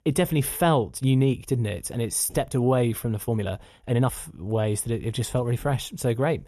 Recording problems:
uneven, jittery; strongly; from 1 to 4.5 s

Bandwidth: 13.5 kHz